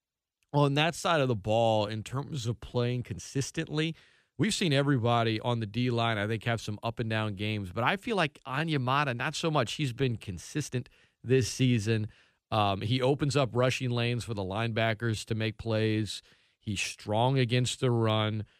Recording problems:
uneven, jittery; strongly; from 0.5 to 18 s

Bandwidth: 14.5 kHz